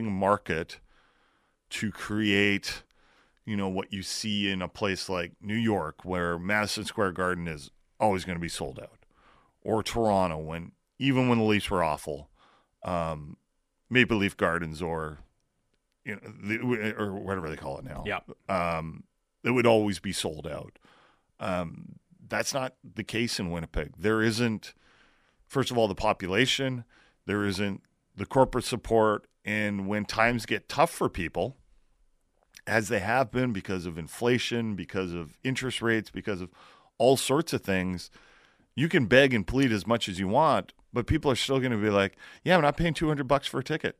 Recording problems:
abrupt cut into speech; at the start

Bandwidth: 14.5 kHz